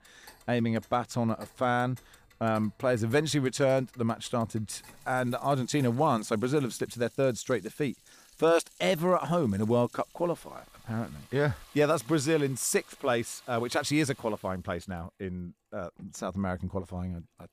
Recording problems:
household noises; faint; throughout; 25 dB below the speech

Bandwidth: 15 kHz